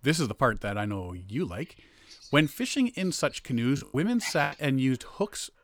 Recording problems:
animal sounds; faint; throughout; 25 dB below the speech
choppy; very; at 4 s; 10% of the speech affected

